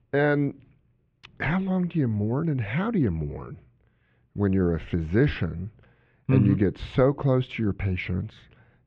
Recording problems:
muffled; very; fading above 2.5 kHz

